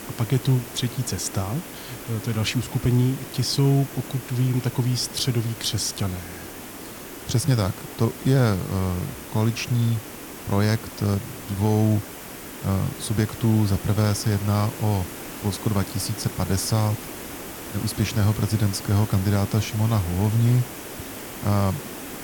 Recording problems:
hiss; noticeable; throughout; 10 dB below the speech

